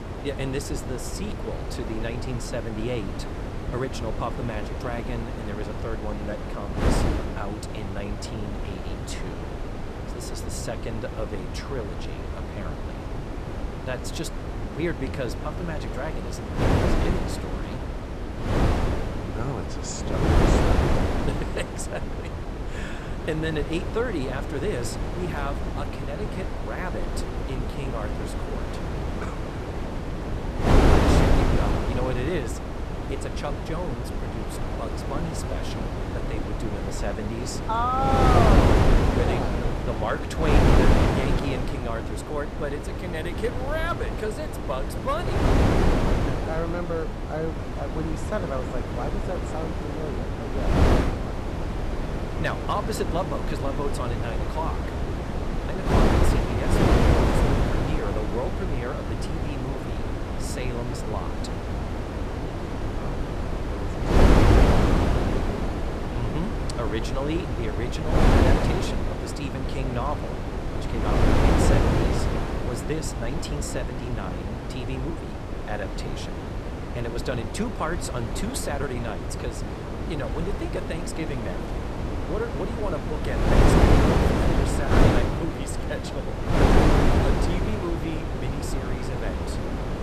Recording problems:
wind noise on the microphone; heavy; 3 dB above the speech

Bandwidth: 13.5 kHz